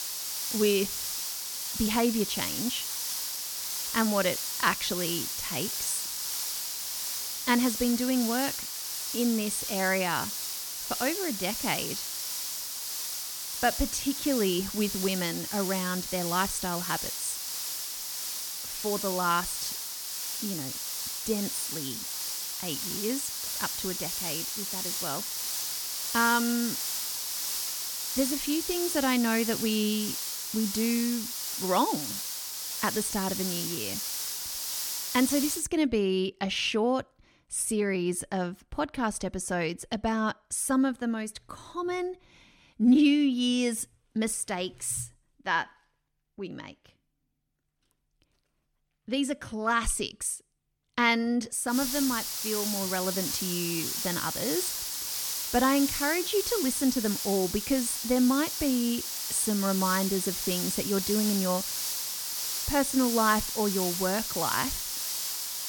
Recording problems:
hiss; loud; until 36 s and from 52 s on; 2 dB below the speech

